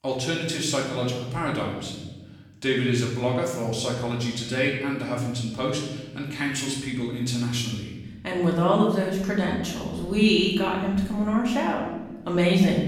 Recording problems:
off-mic speech; far
room echo; noticeable; dies away in 1.1 s

